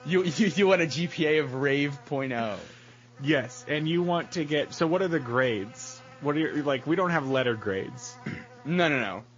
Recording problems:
garbled, watery; slightly; nothing above 6.5 kHz
electrical hum; faint; throughout; 60 Hz, 20 dB below the speech

